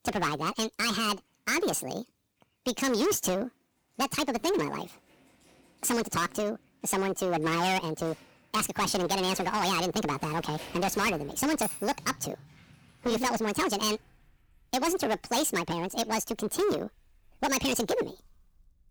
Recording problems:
distortion; heavy; 11% of the sound clipped
wrong speed and pitch; too fast and too high; 1.7 times normal speed
household noises; noticeable; throughout; 15 dB below the speech

